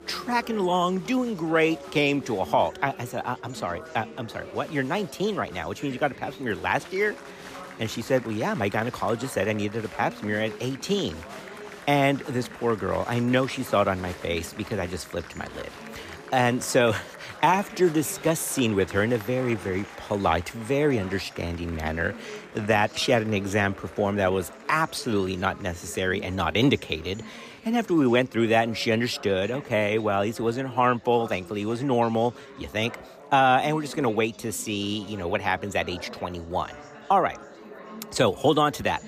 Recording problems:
chatter from many people; noticeable; throughout; 15 dB below the speech

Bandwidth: 14.5 kHz